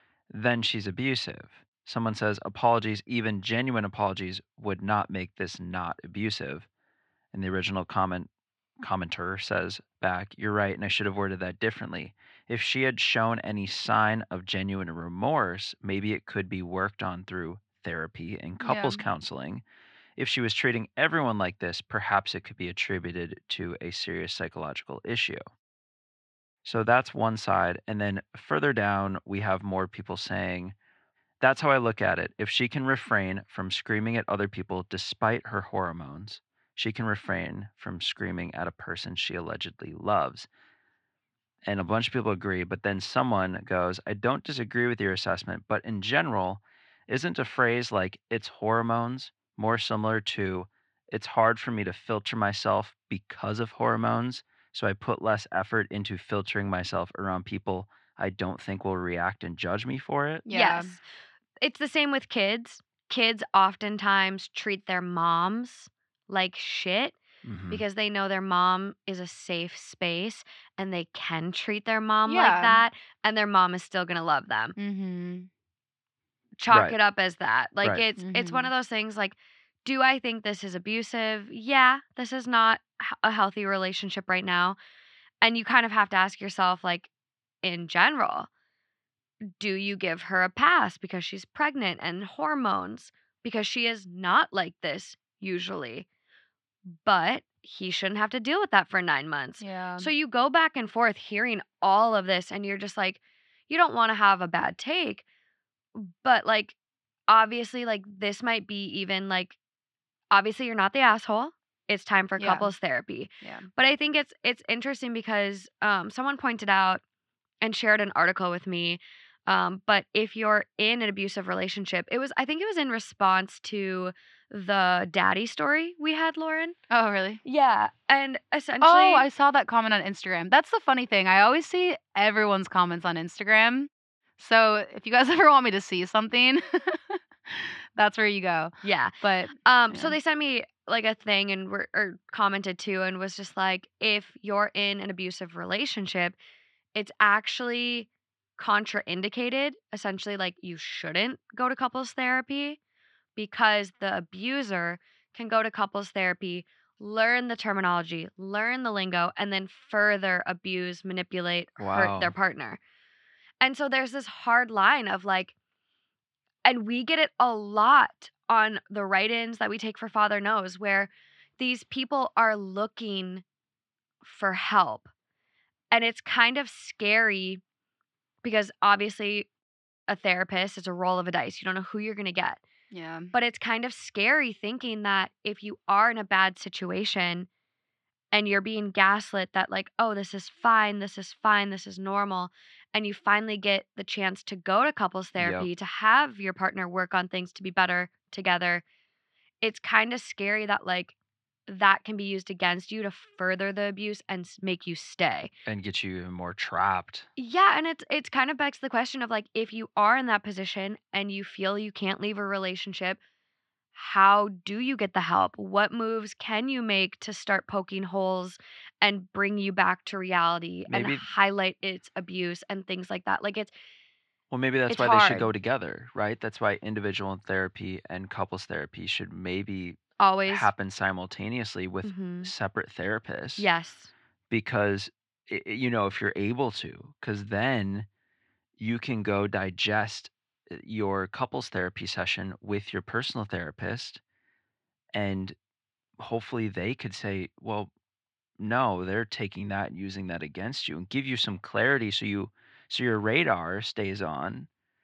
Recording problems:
muffled; slightly; fading above 3 kHz
thin; very slightly; fading below 900 Hz

